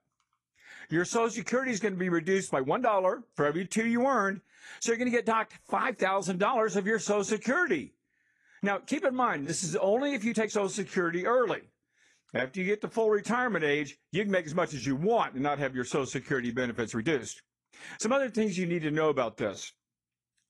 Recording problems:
garbled, watery; slightly
uneven, jittery; strongly; from 0.5 to 20 s

